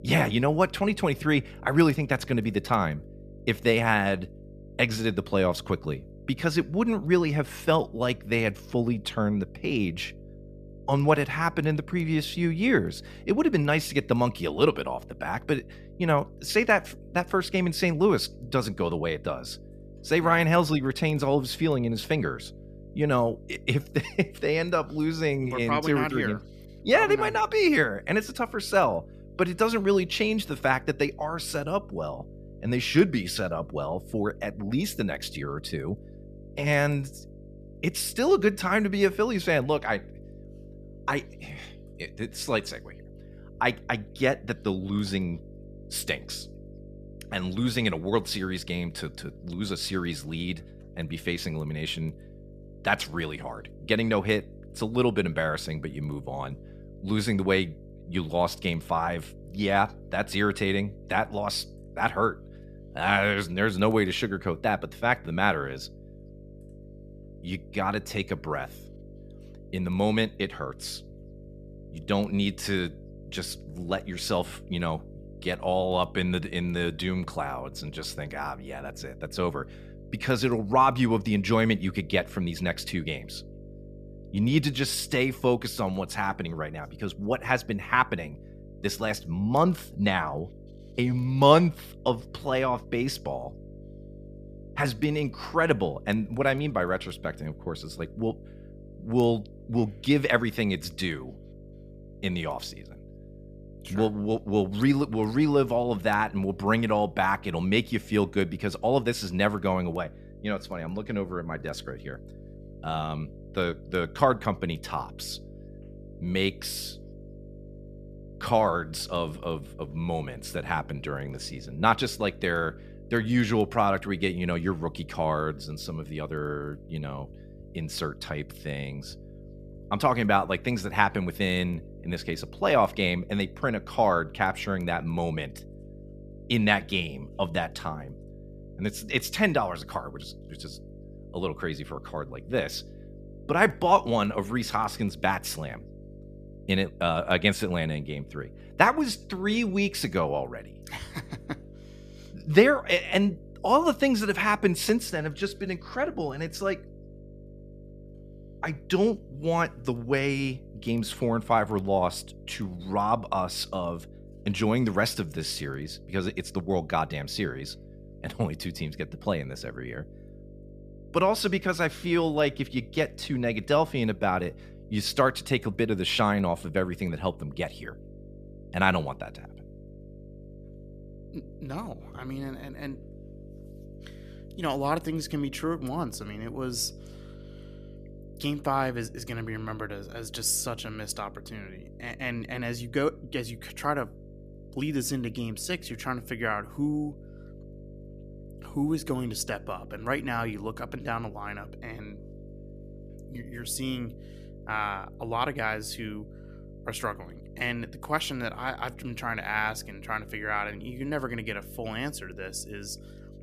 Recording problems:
electrical hum; faint; throughout; 50 Hz, 25 dB below the speech

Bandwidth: 14.5 kHz